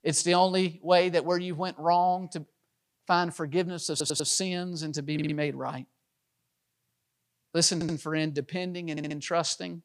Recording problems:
audio stuttering; 4 times, first at 4 s

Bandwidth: 15 kHz